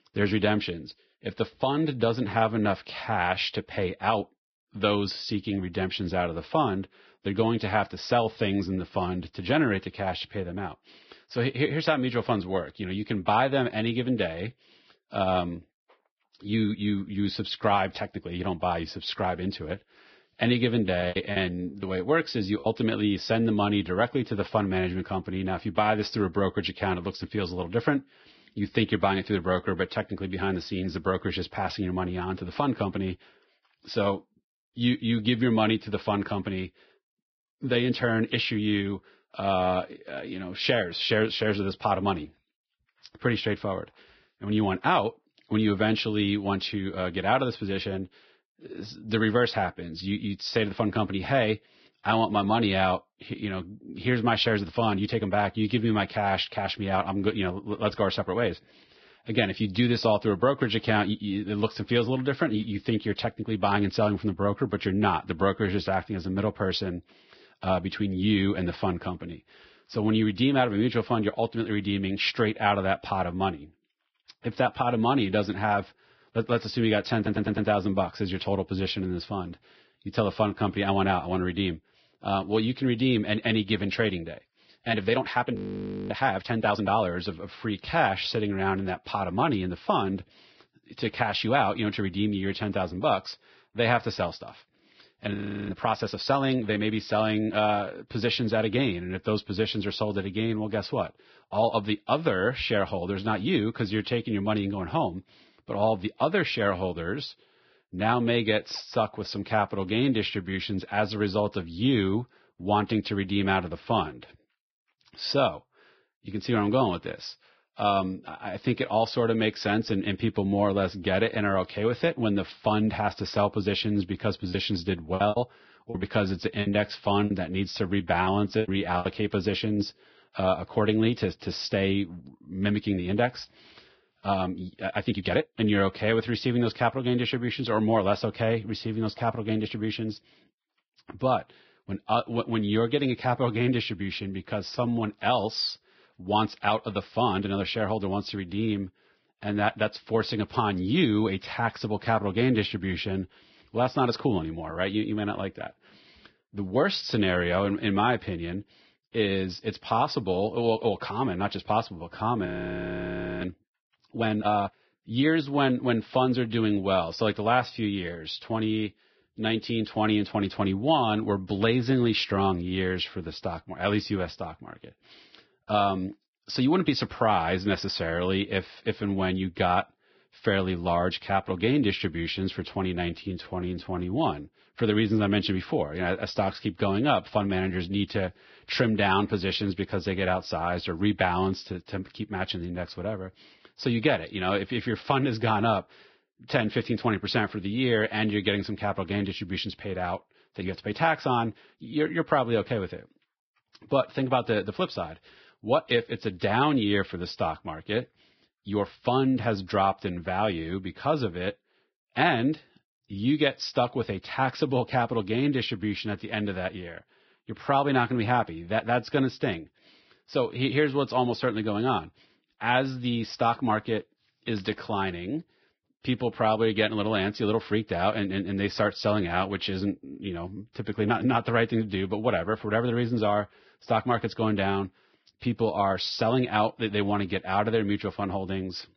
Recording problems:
garbled, watery; badly; nothing above 5.5 kHz
choppy; very; from 21 to 23 s and from 2:05 to 2:09; 14% of the speech affected
uneven, jittery; strongly; from 54 s to 3:35
audio stuttering; at 1:17
audio freezing; at 1:26 for 0.5 s, at 1:35 and at 2:42 for 1 s

